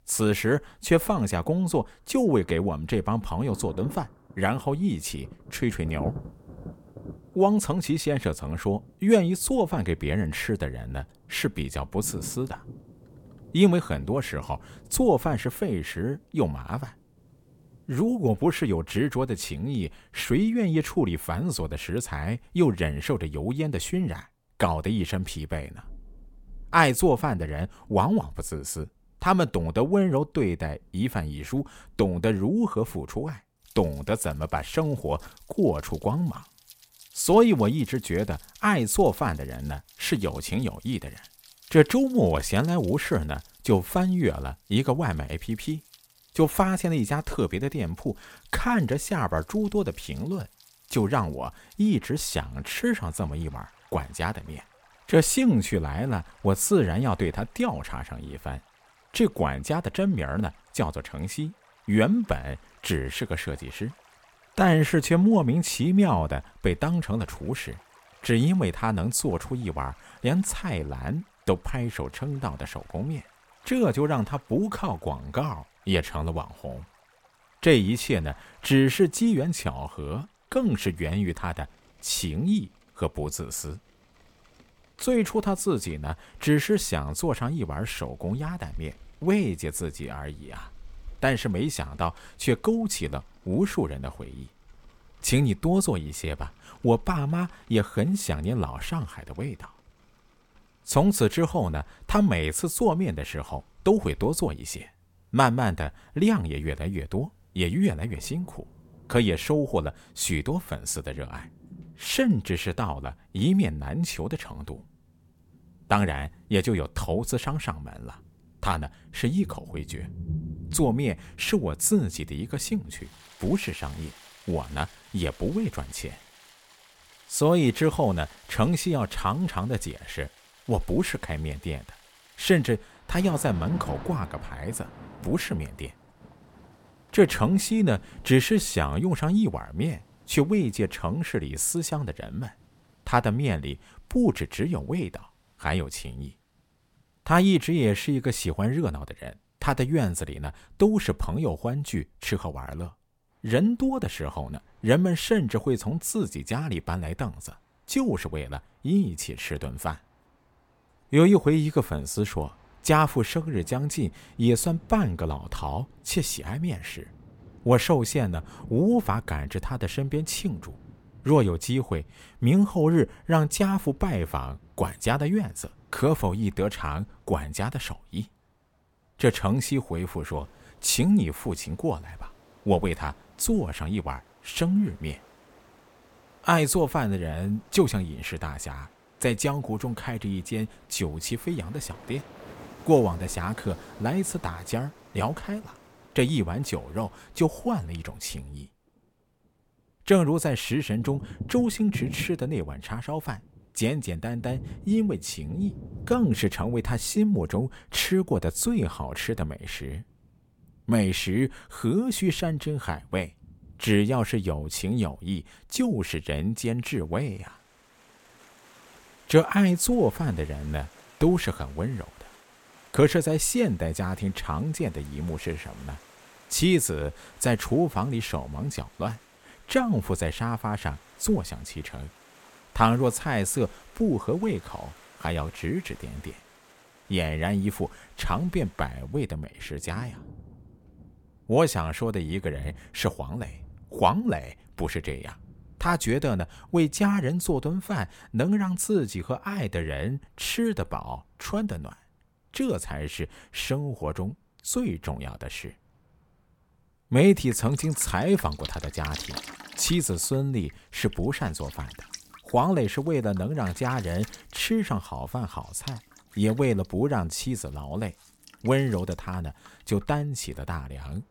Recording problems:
rain or running water; faint; throughout; 20 dB below the speech

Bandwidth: 17 kHz